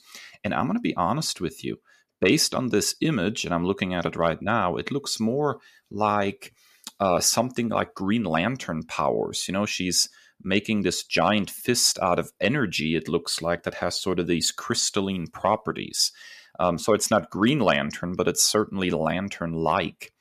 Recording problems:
none

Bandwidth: 14.5 kHz